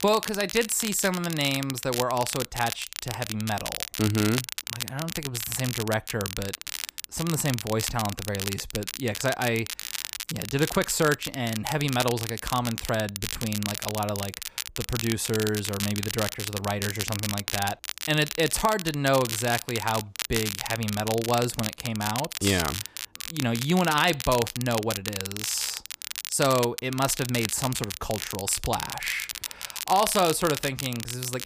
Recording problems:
crackle, like an old record; loud; 5 dB below the speech

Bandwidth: 15 kHz